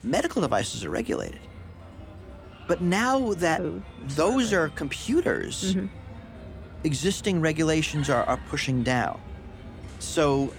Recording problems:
animal sounds; noticeable; throughout; 15 dB below the speech

